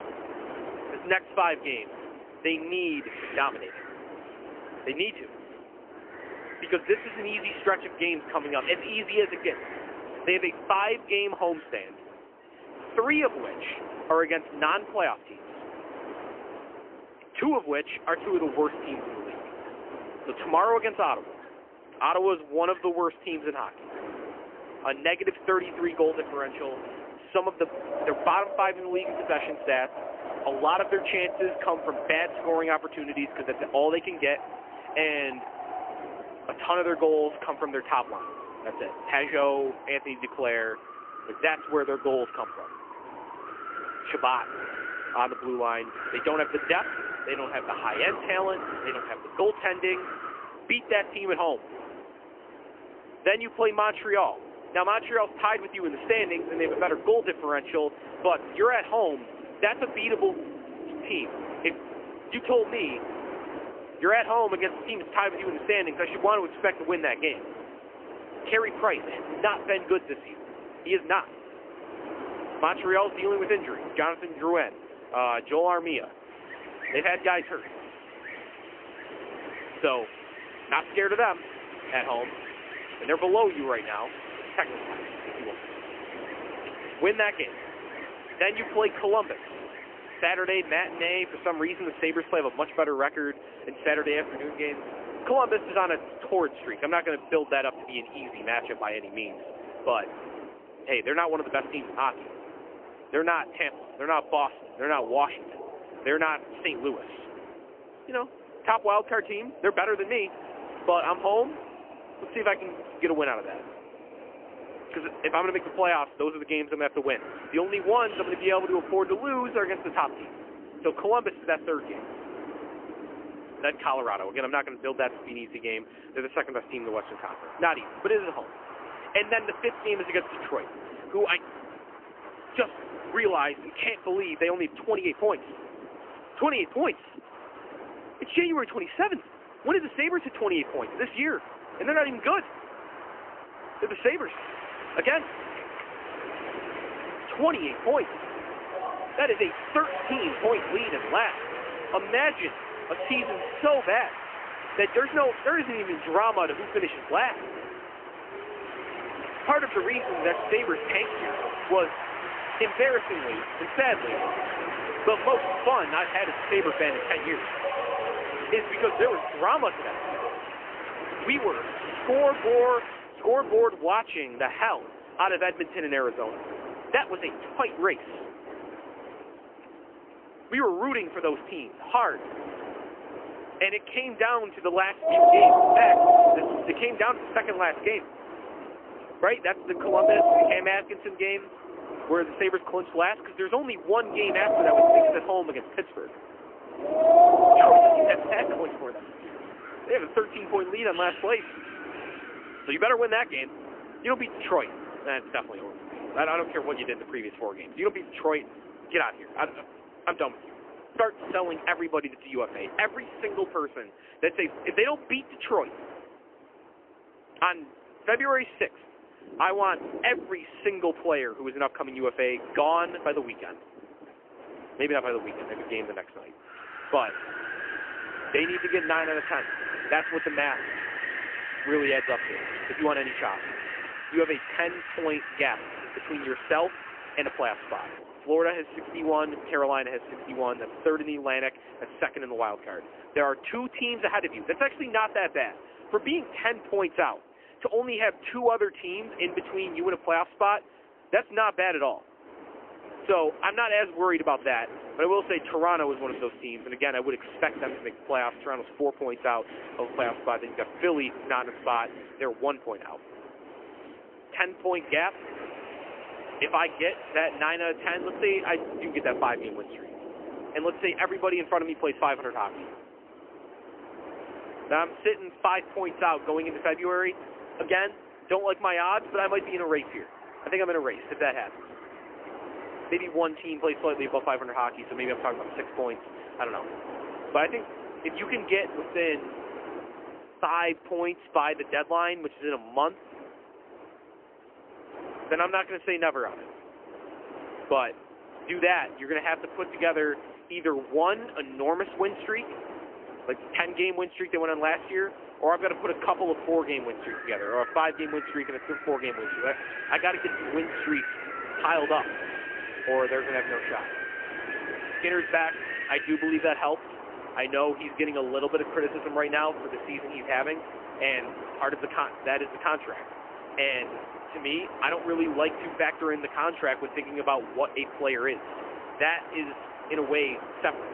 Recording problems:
phone-call audio; poor line; nothing above 3 kHz
wind in the background; loud; throughout; 5 dB below the speech

